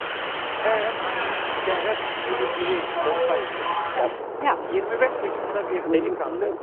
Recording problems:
phone-call audio
traffic noise; very loud; throughout; 2 dB above the speech

